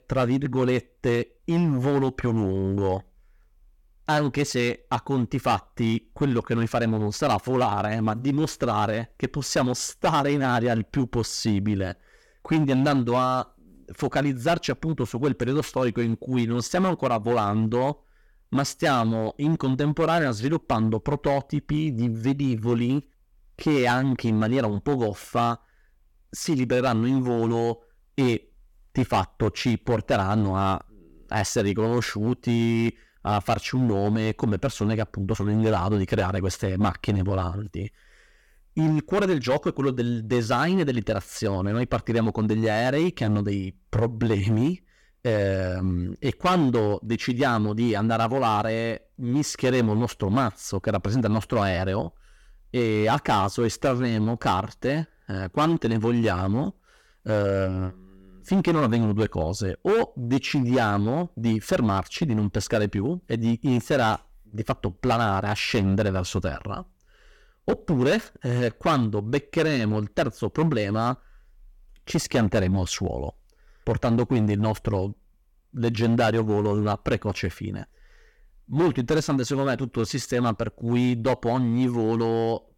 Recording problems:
distortion; slight; 7% of the sound clipped

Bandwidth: 17.5 kHz